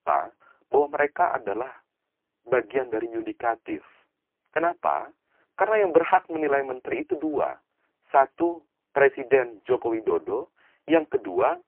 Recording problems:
phone-call audio; poor line

